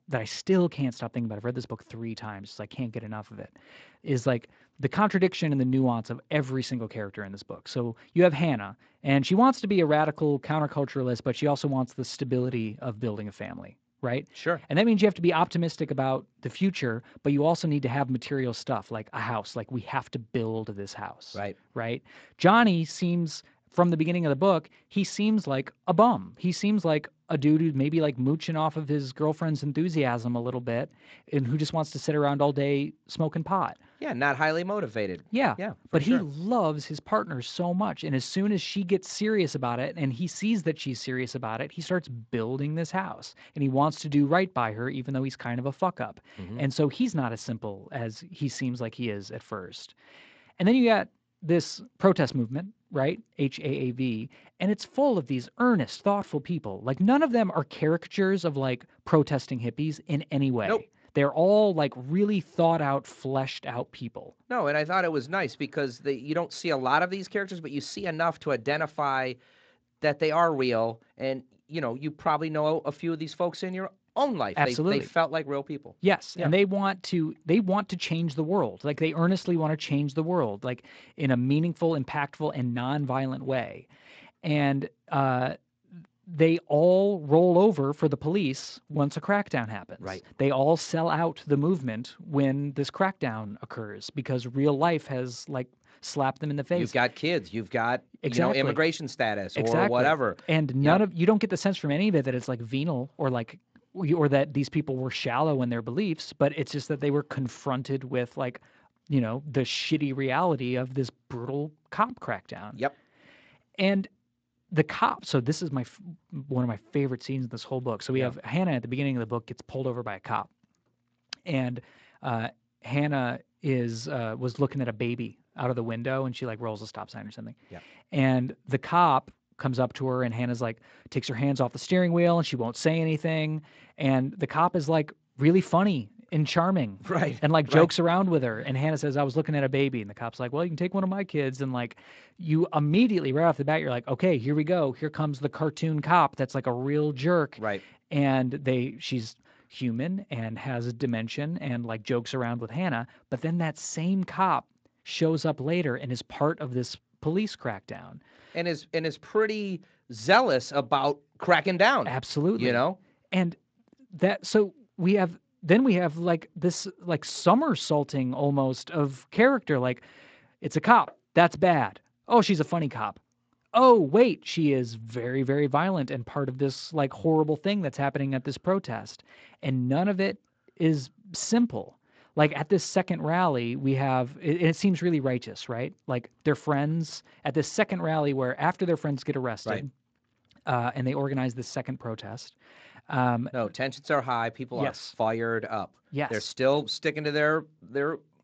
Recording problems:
garbled, watery; slightly; nothing above 7.5 kHz

